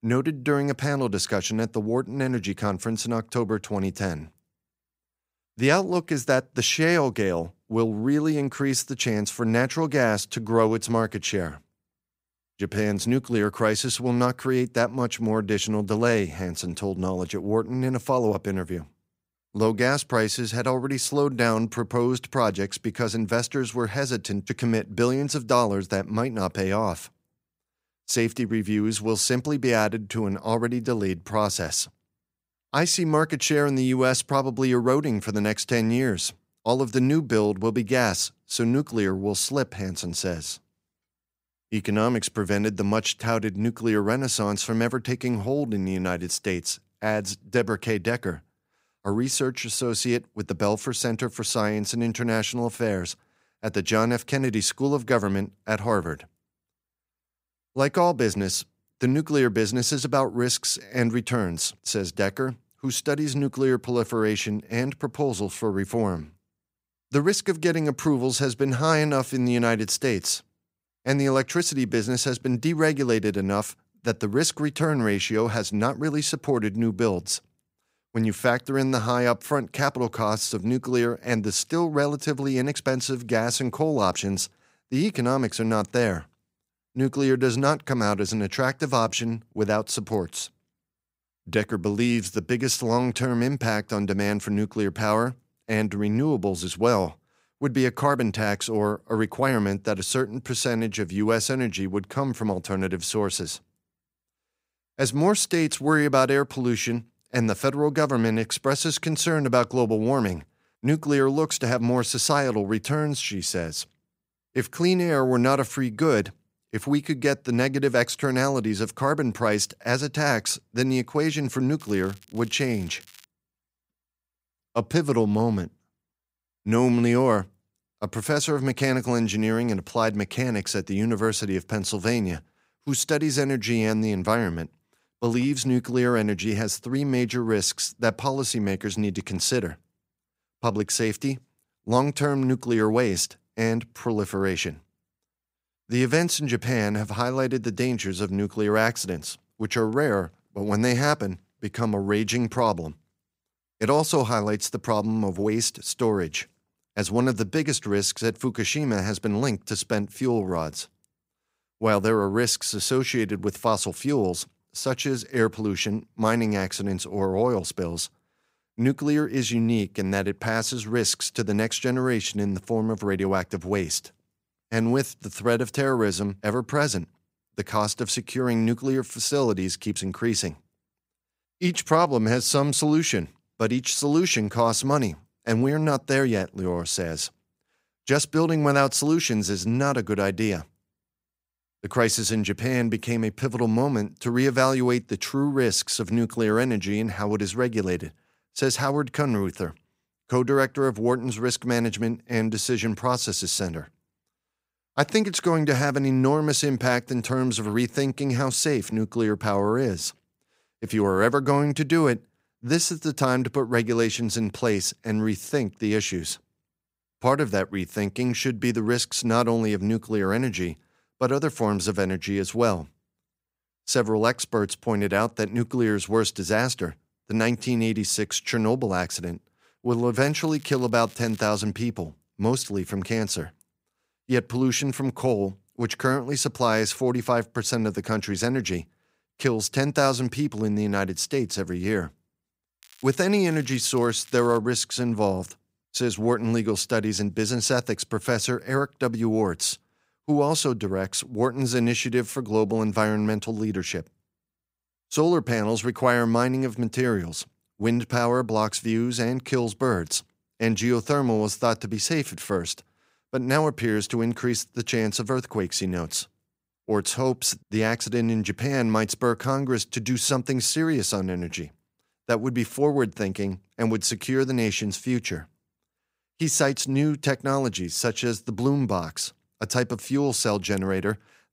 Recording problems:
crackling; very faint; 4 times, first at 1:52; 25 dB below the speech

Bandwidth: 15.5 kHz